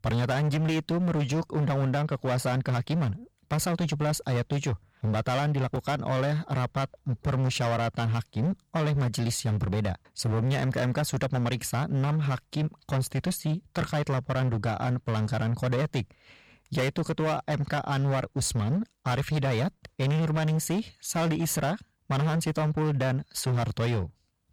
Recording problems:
distortion; slight; 24% of the sound clipped

